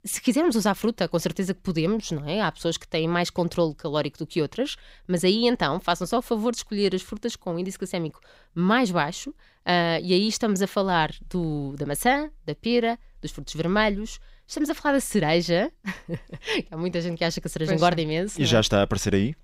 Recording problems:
none

